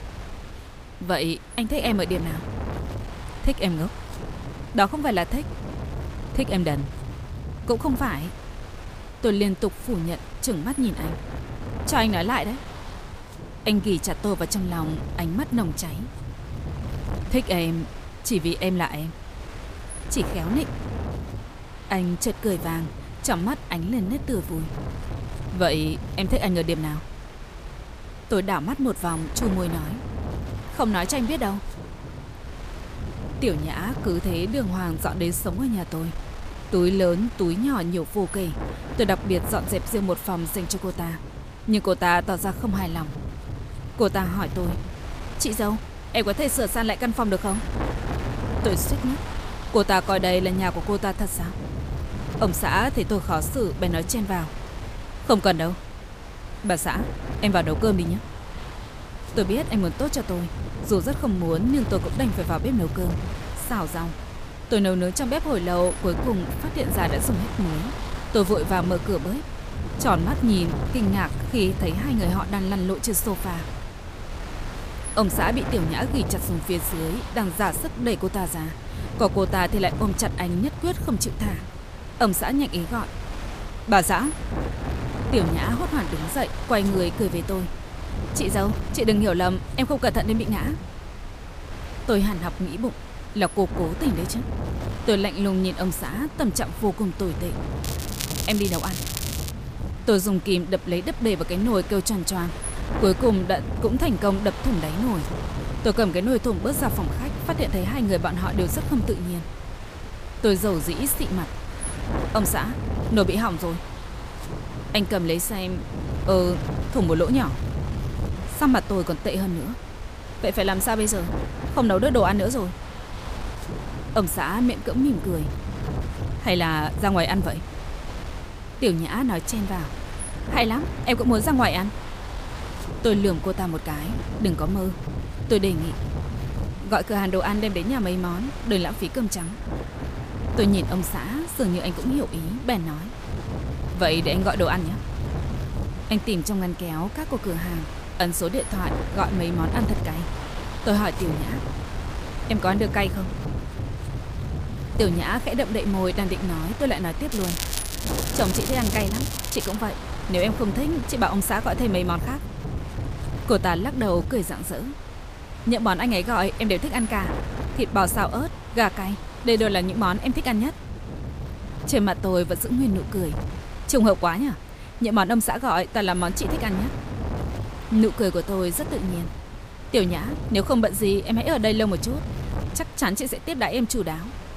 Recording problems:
crackling; loud; from 1:38 to 1:40 and from 2:37 to 2:40; 6 dB below the speech
wind noise on the microphone; occasional gusts; 10 dB below the speech

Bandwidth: 15 kHz